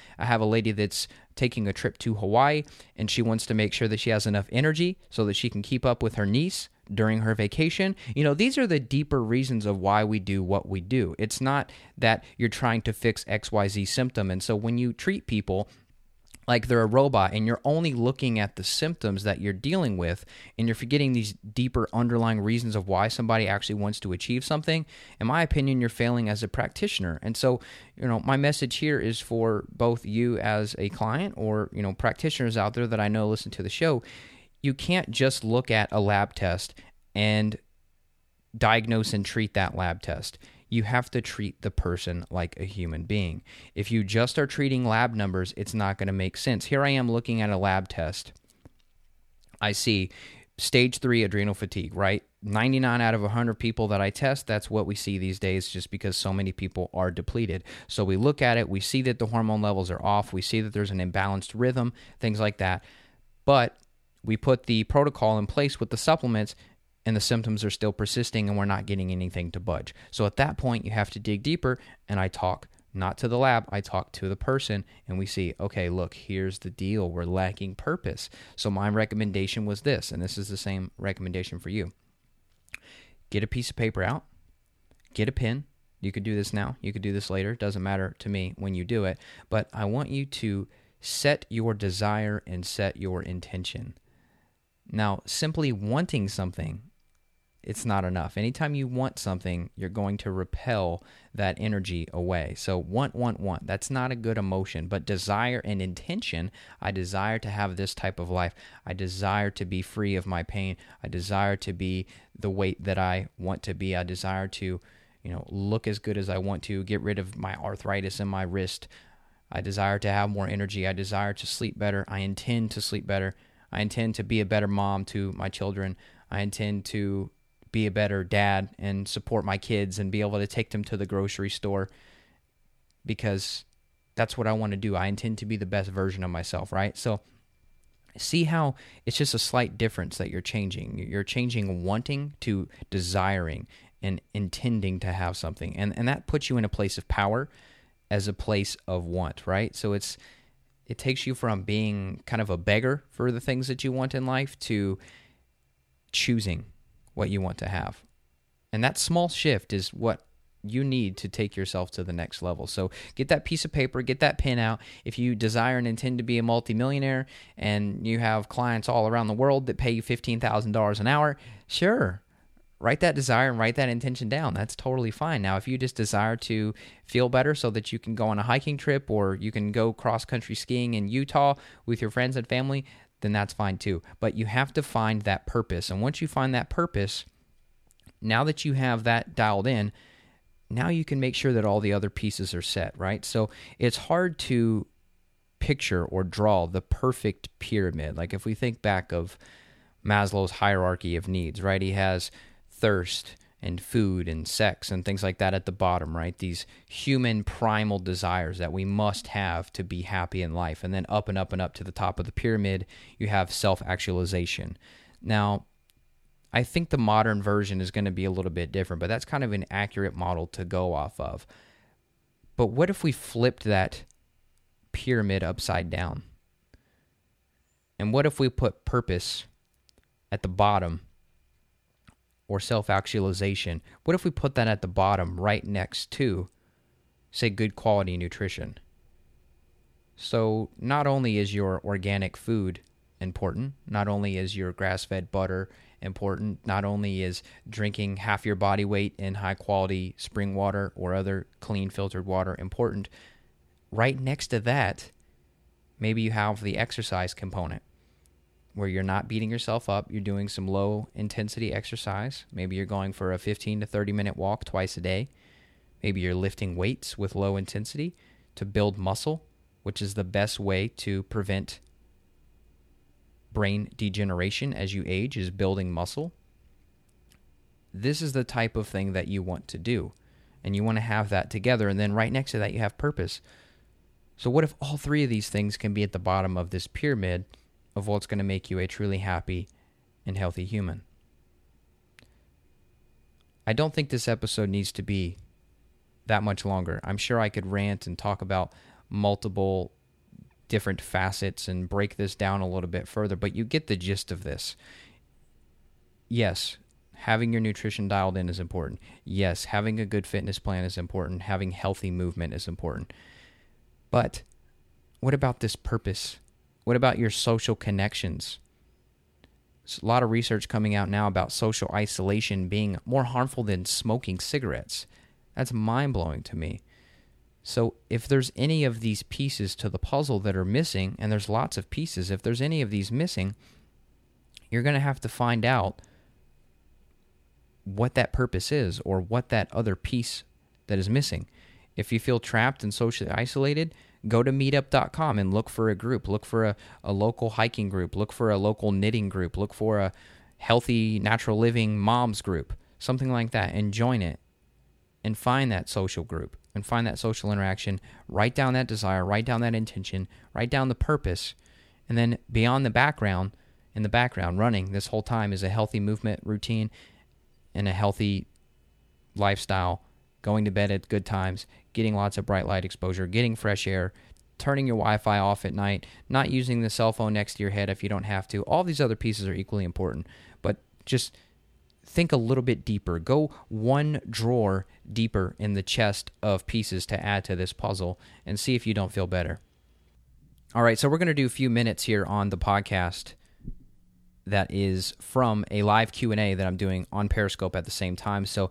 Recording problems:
none

